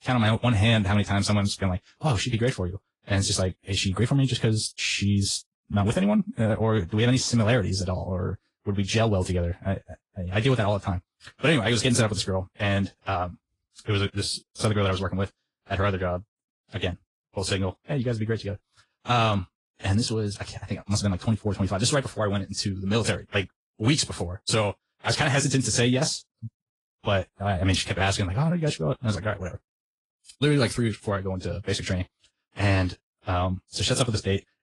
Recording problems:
wrong speed, natural pitch; too fast; 1.5 times normal speed
garbled, watery; slightly; nothing above 10 kHz

